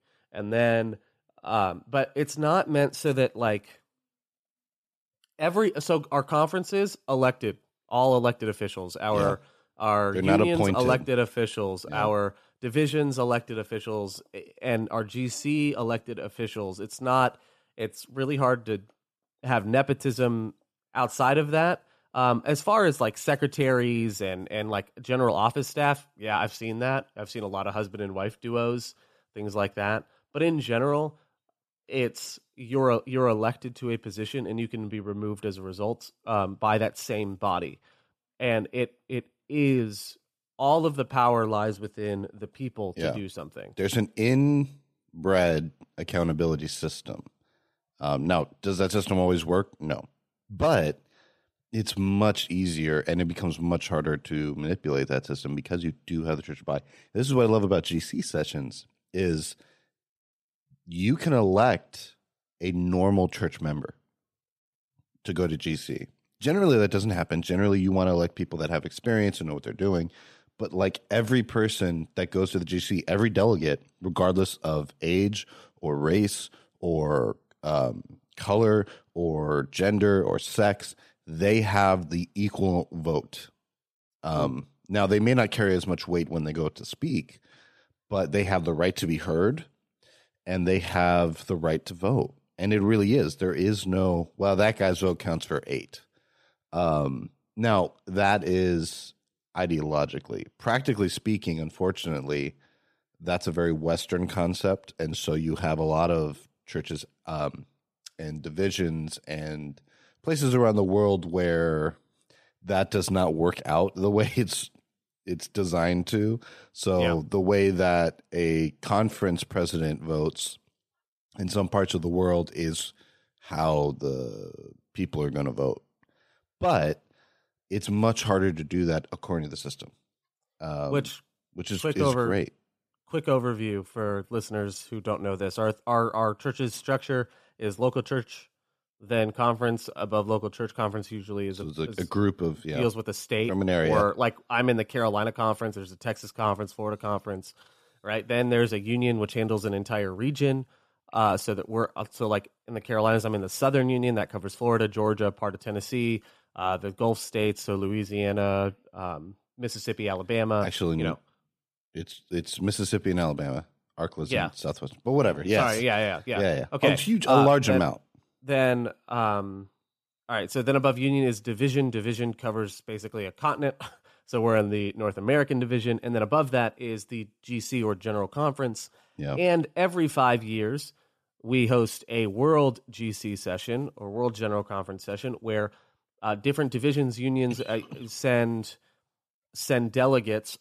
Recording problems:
none

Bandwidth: 14.5 kHz